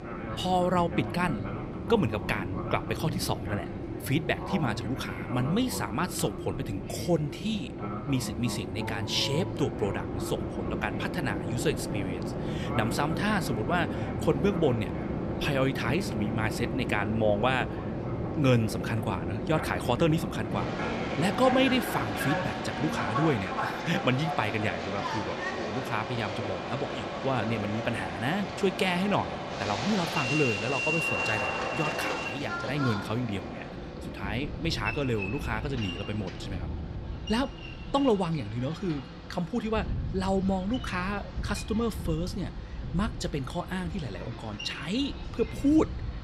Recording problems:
train or aircraft noise; loud; throughout; 3 dB below the speech

